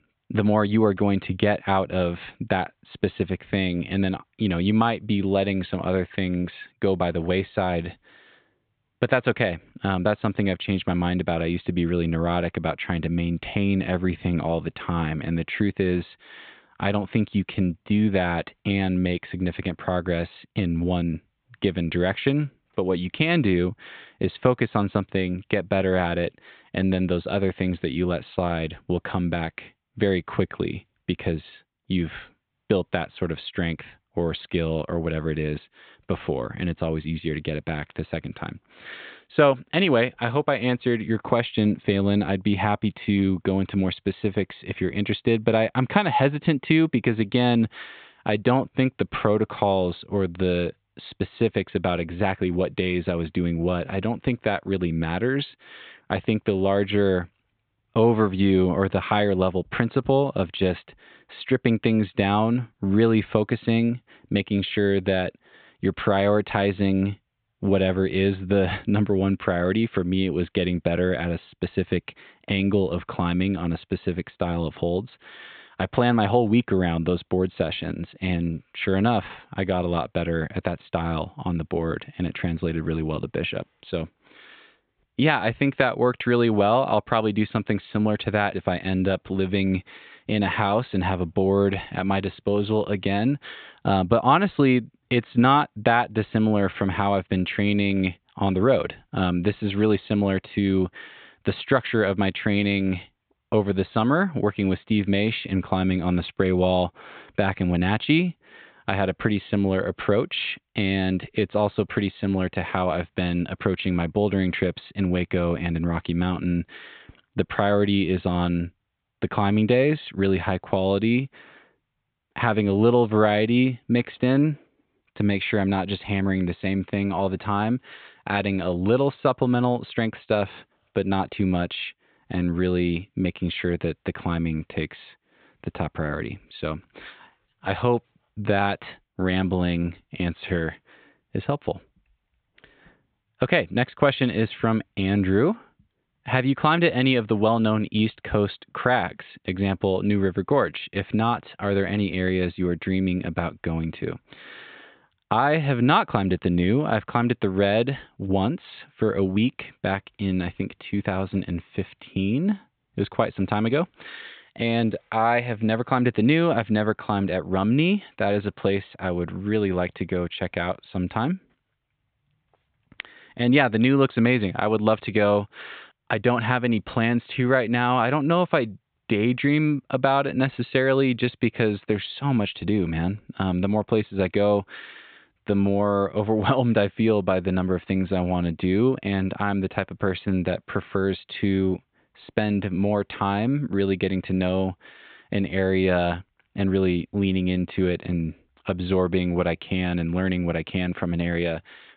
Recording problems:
high frequencies cut off; severe; nothing above 4 kHz

